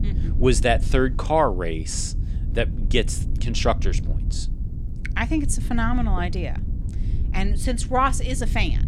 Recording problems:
low rumble; noticeable; throughout; 20 dB below the speech

